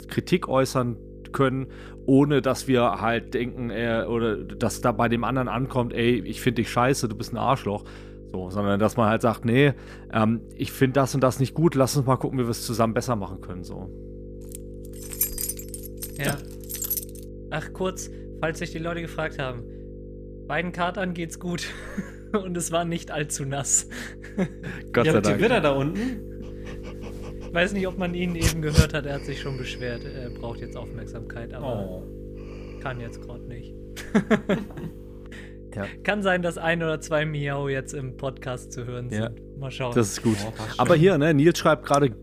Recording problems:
electrical hum; noticeable; throughout; 50 Hz, 20 dB below the speech
jangling keys; noticeable; from 15 to 17 s; peak level with the speech
dog barking; loud; at 28 s; peak 2 dB above the speech

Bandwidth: 14.5 kHz